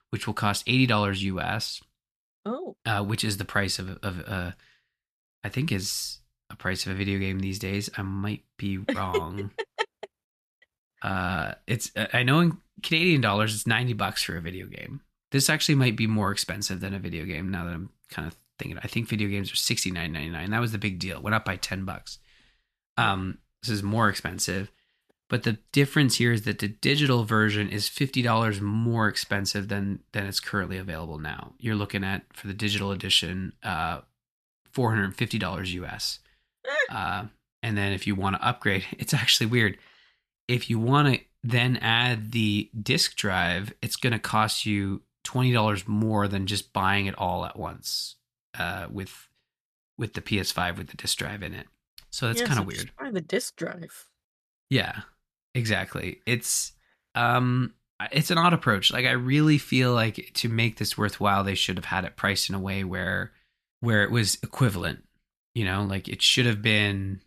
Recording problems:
none

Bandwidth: 14 kHz